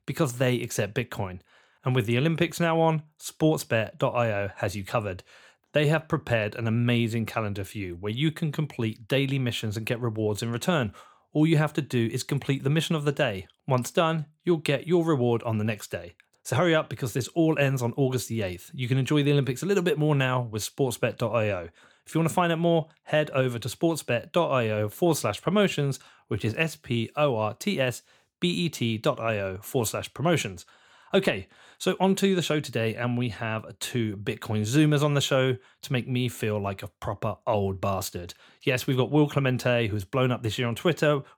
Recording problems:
none

